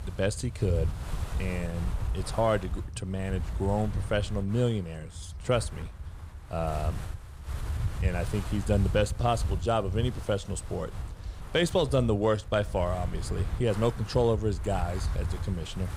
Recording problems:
wind noise on the microphone; occasional gusts; 15 dB below the speech

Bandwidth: 15.5 kHz